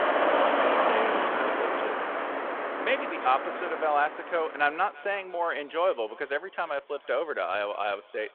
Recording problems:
echo of what is said; faint; throughout; 340 ms later, 20 dB below the speech
phone-call audio
traffic noise; very loud; throughout; 2 dB above the speech

